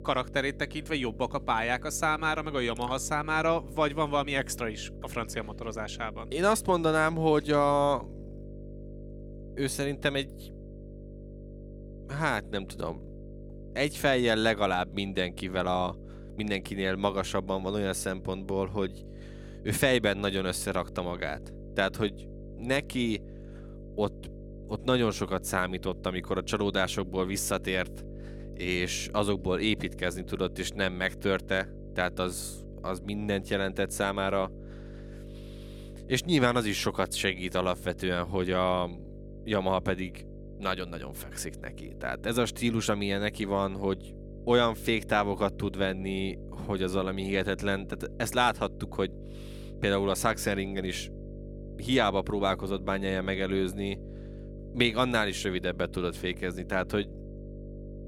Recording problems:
electrical hum; faint; throughout; 50 Hz, 20 dB below the speech

